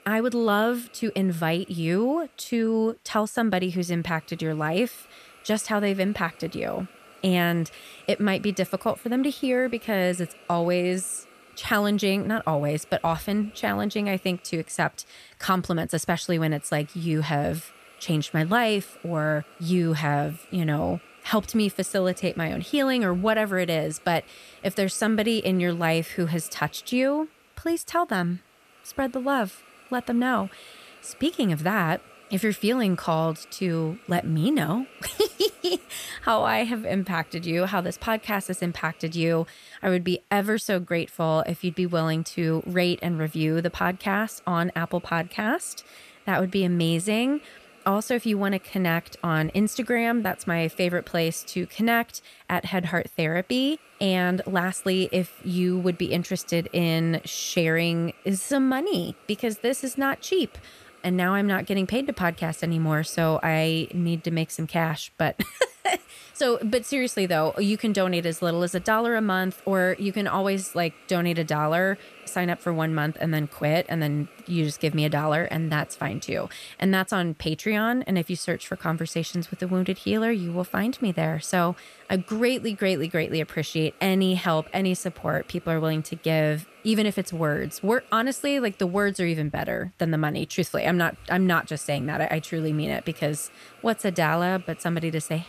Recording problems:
hiss; faint; throughout; 25 dB below the speech

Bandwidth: 14.5 kHz